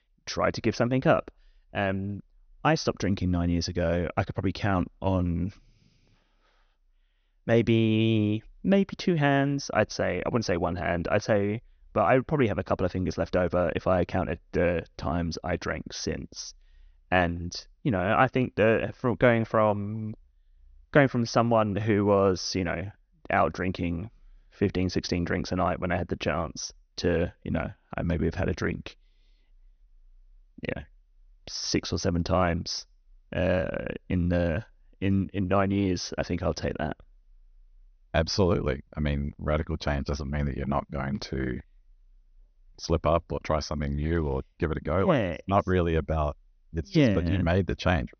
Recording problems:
high frequencies cut off; noticeable; nothing above 6.5 kHz

